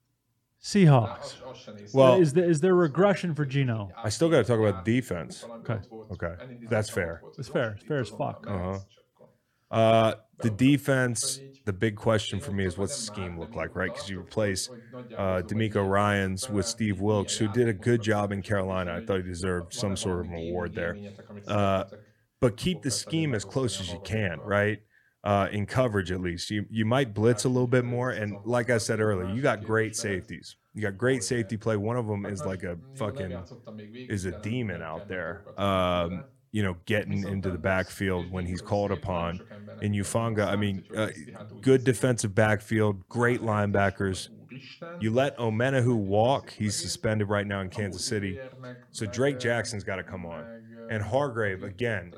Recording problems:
voice in the background; noticeable; throughout; 20 dB below the speech

